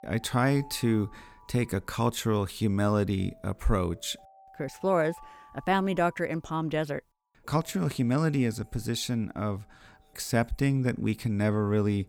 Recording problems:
alarms or sirens; faint; throughout; 25 dB below the speech

